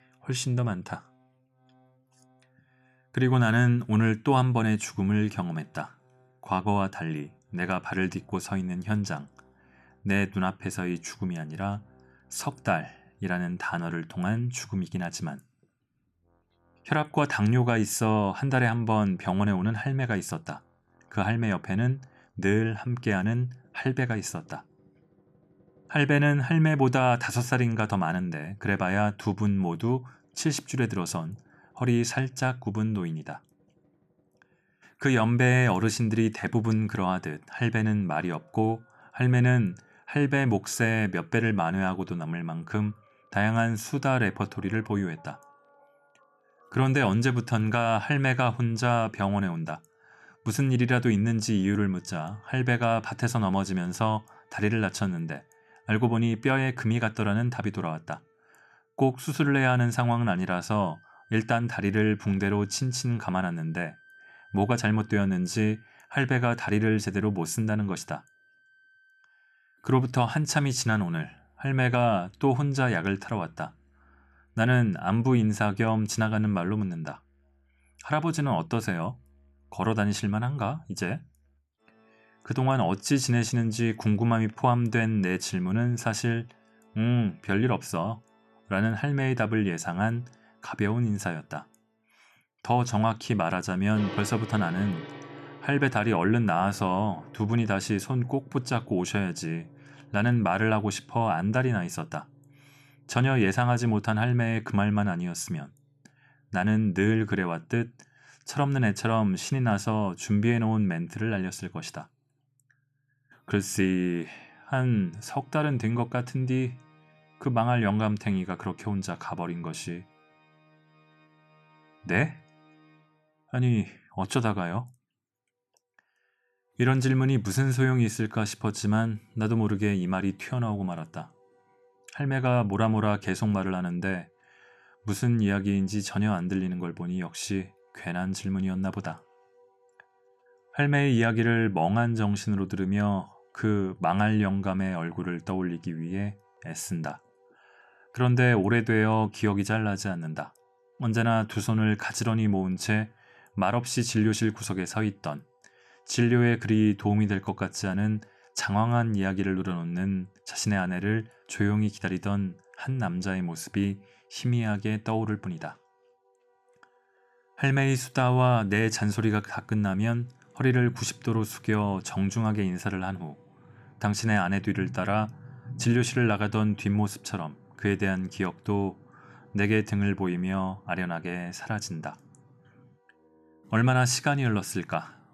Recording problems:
background music; faint; throughout; 30 dB below the speech

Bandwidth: 14.5 kHz